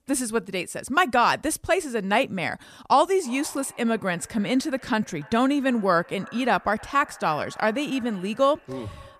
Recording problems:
echo of what is said; faint; from 3 s on; 290 ms later, 20 dB below the speech

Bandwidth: 14.5 kHz